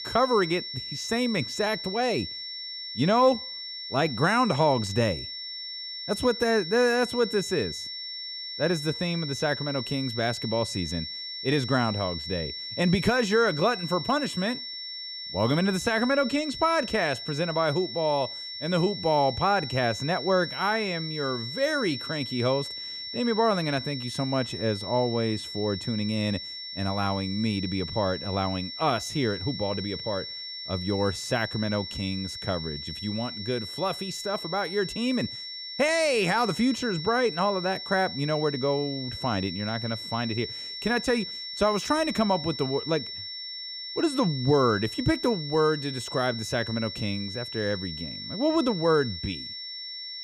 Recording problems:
high-pitched whine; loud; throughout; 5.5 kHz, 7 dB below the speech

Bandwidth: 15.5 kHz